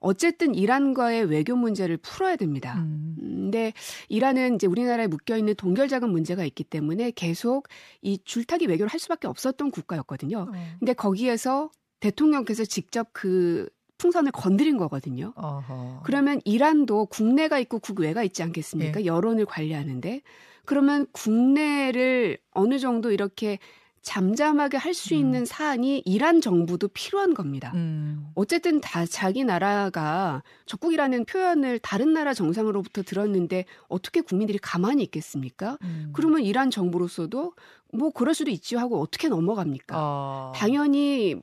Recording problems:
uneven, jittery; strongly; from 4 to 39 s

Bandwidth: 14.5 kHz